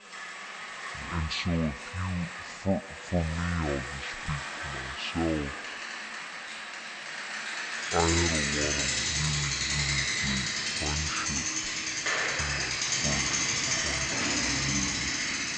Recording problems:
wrong speed and pitch; too slow and too low; 0.5 times normal speed
echo of what is said; faint; throughout; 150 ms later, 20 dB below the speech
traffic noise; very loud; throughout; 5 dB above the speech
background chatter; faint; throughout; 2 voices, 25 dB below the speech

